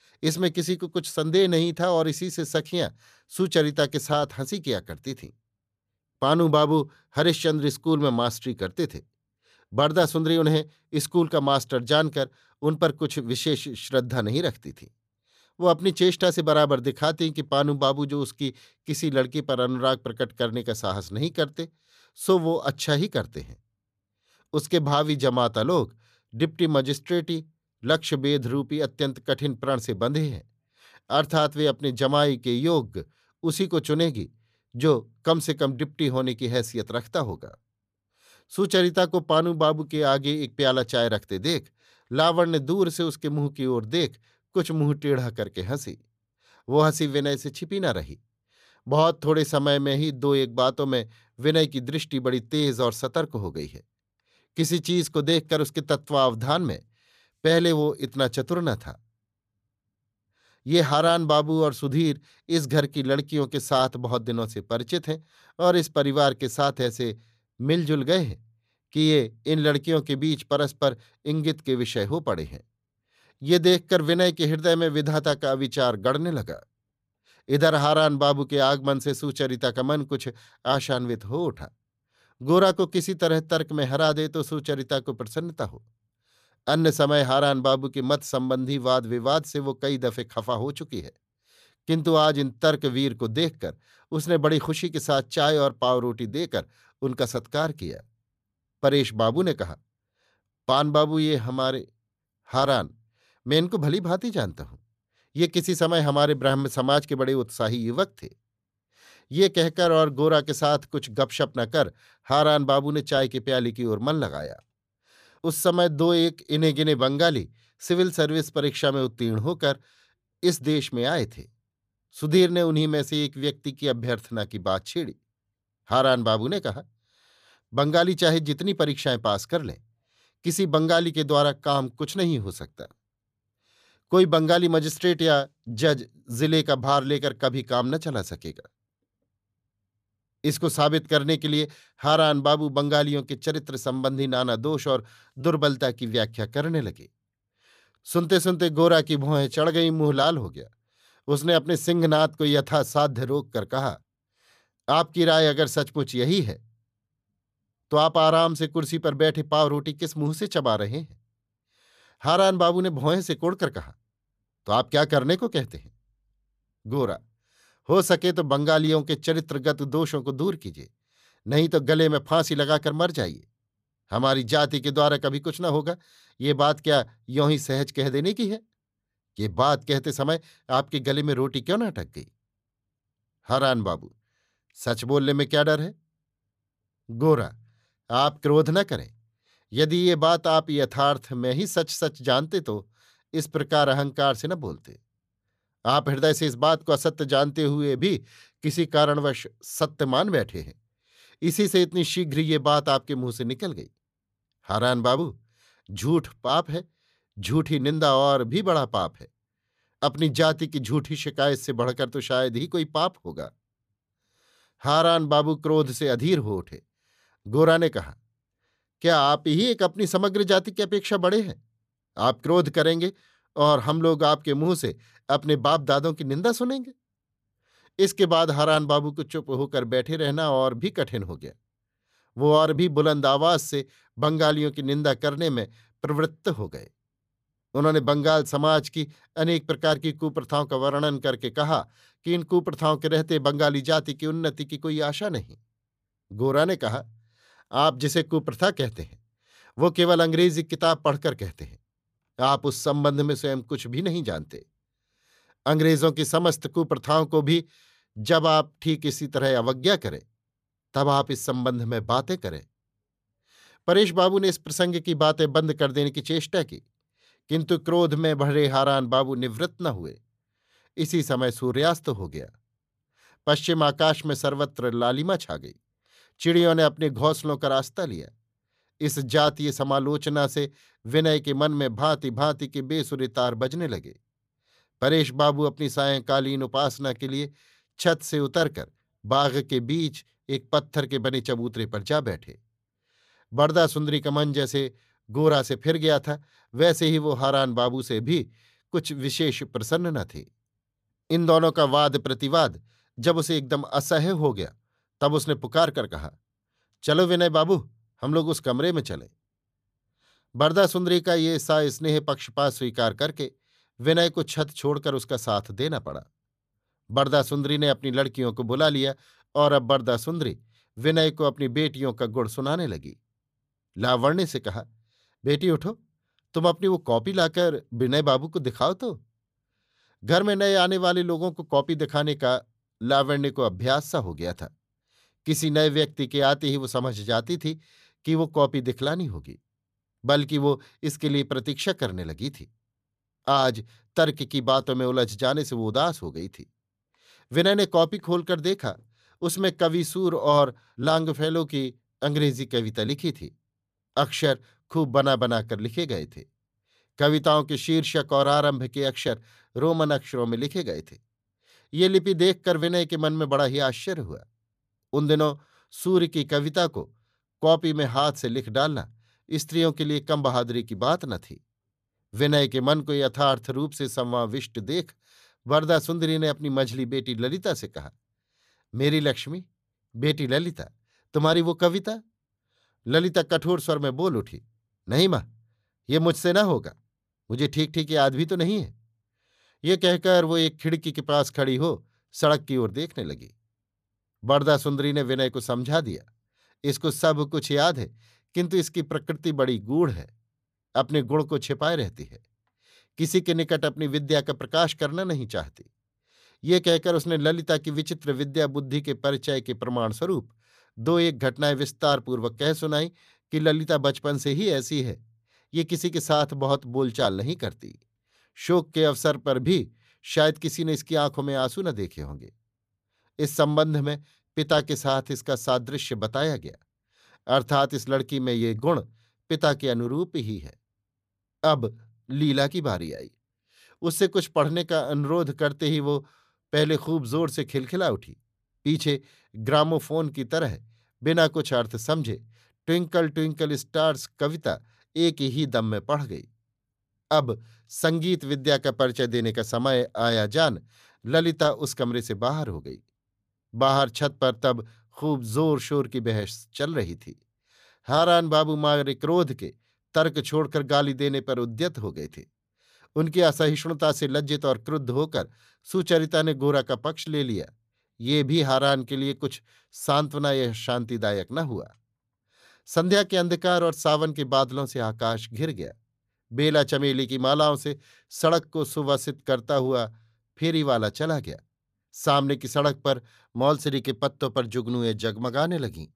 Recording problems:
none

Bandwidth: 14.5 kHz